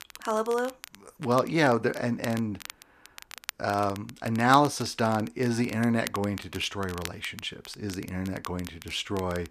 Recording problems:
crackle, like an old record; noticeable; 15 dB below the speech

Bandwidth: 14.5 kHz